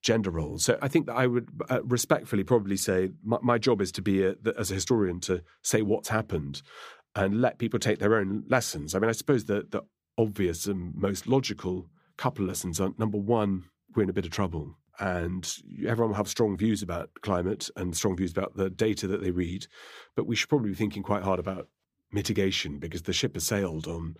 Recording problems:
none

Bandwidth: 15 kHz